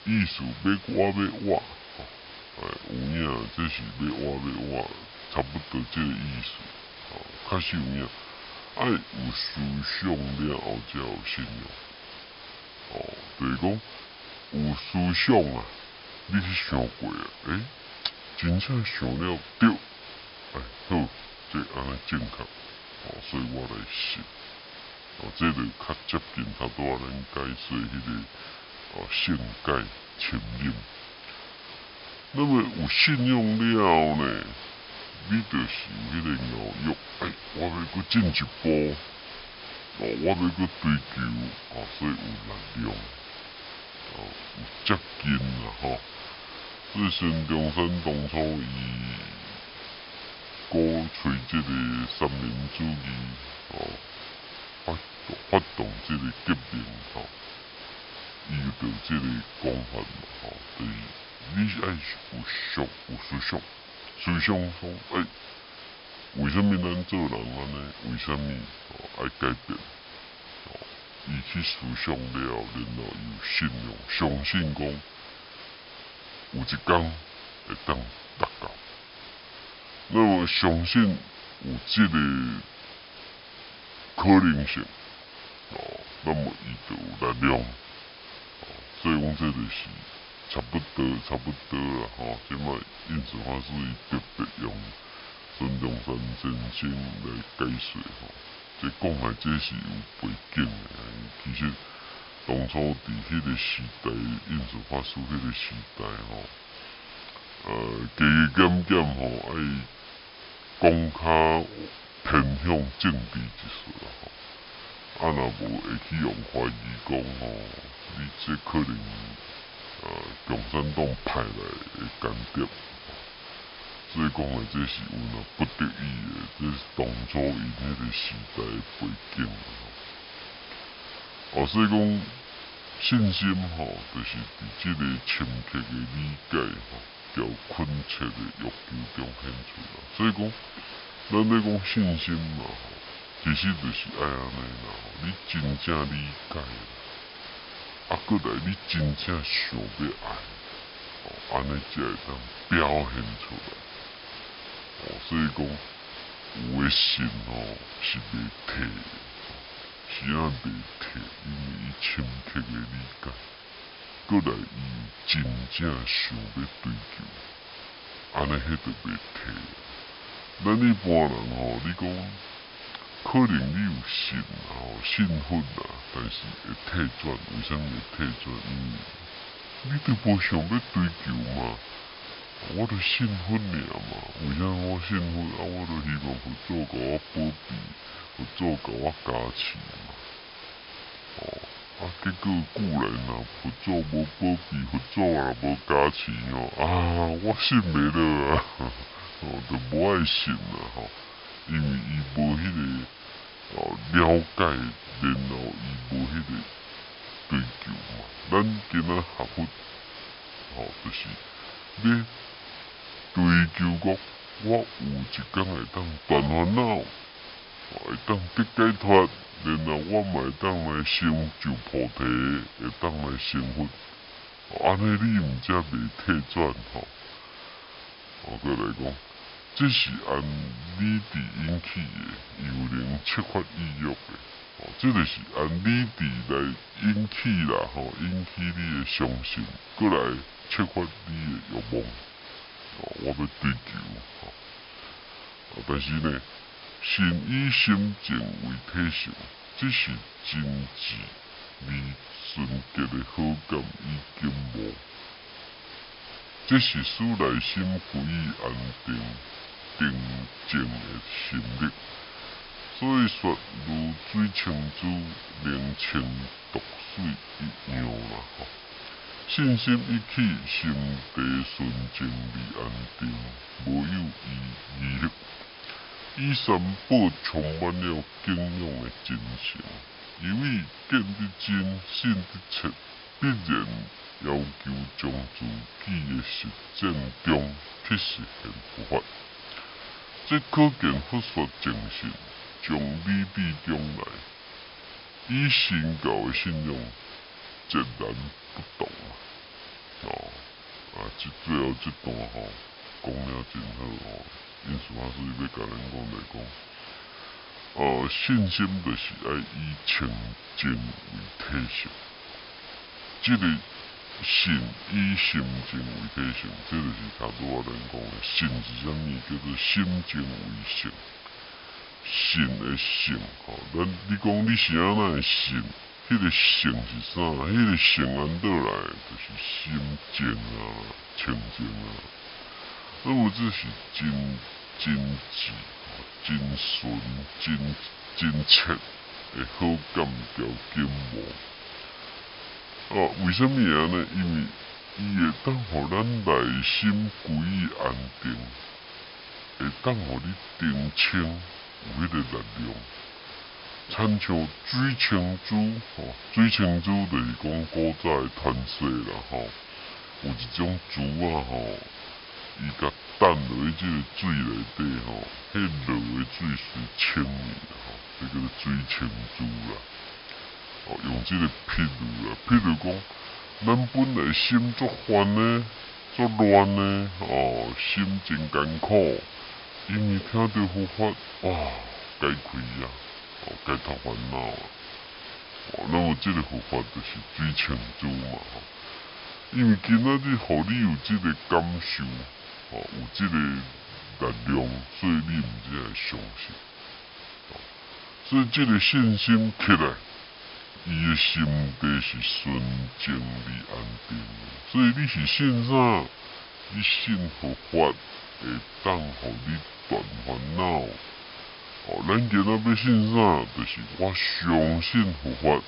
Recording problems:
wrong speed and pitch; too slow and too low; 0.7 times normal speed
high frequencies cut off; noticeable; nothing above 5.5 kHz
hiss; noticeable; throughout; 15 dB below the speech

